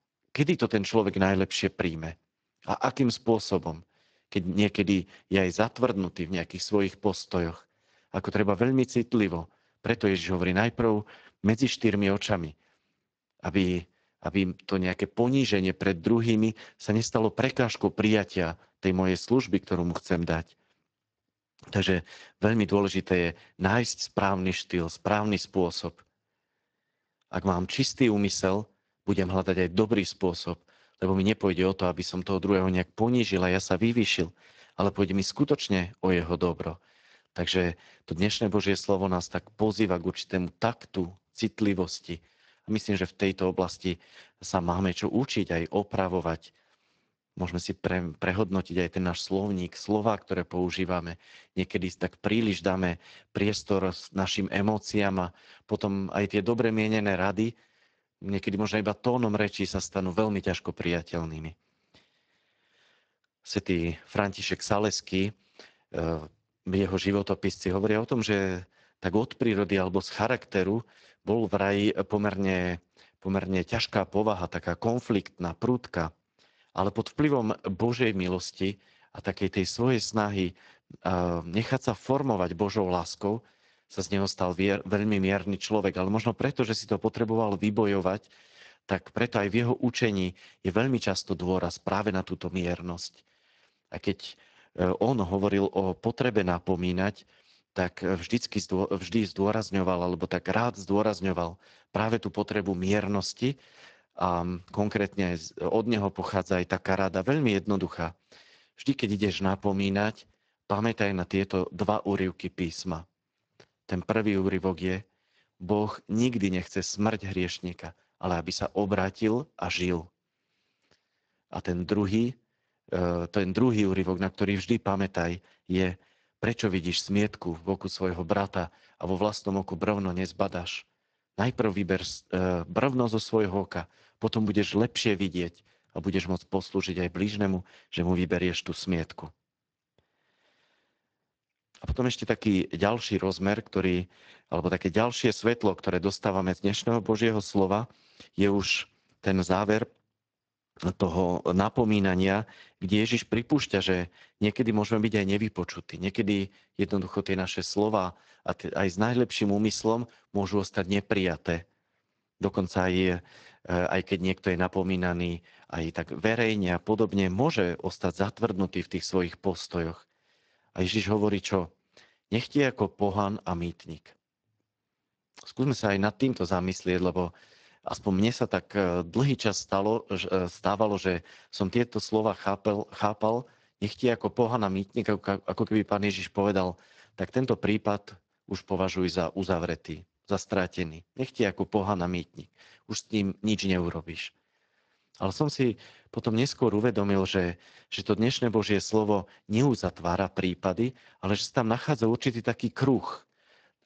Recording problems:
garbled, watery; slightly

